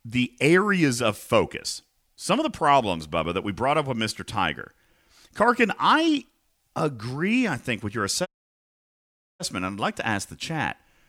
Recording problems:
audio cutting out; at 8.5 s for 1 s

